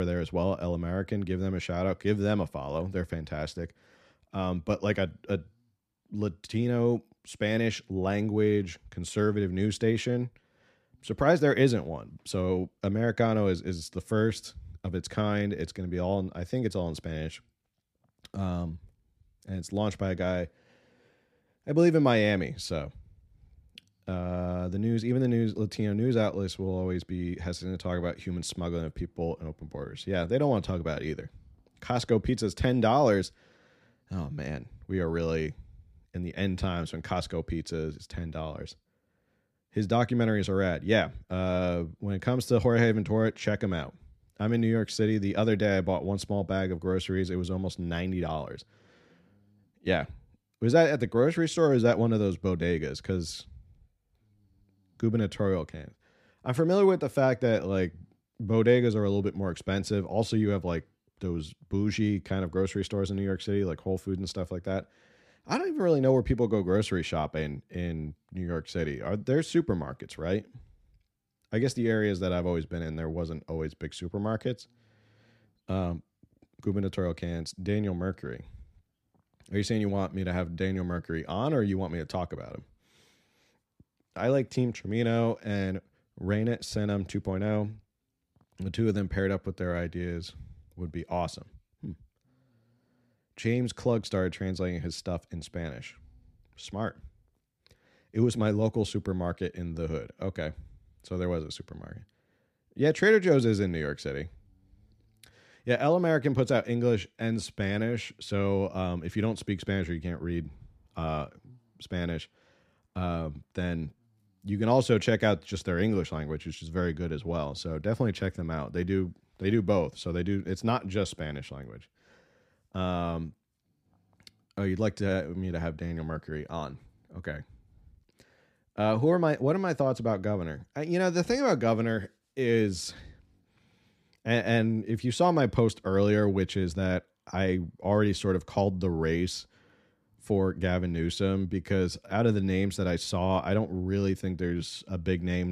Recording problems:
abrupt cut into speech; at the start and the end

